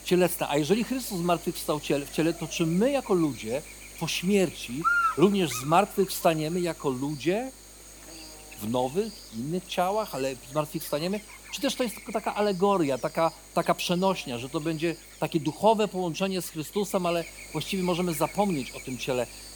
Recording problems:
electrical hum; loud; throughout; 50 Hz, 8 dB below the speech

